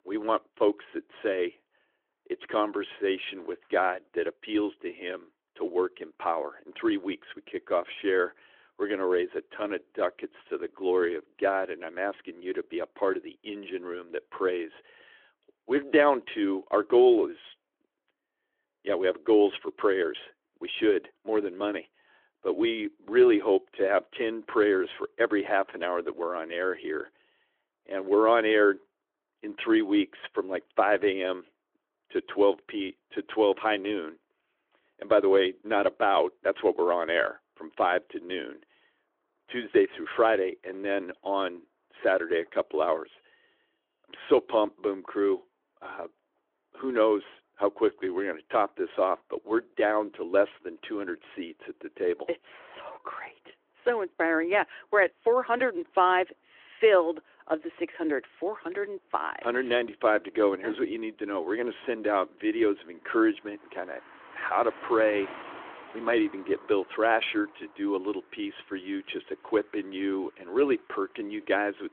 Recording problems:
phone-call audio; nothing above 3.5 kHz
traffic noise; faint; throughout; 25 dB below the speech

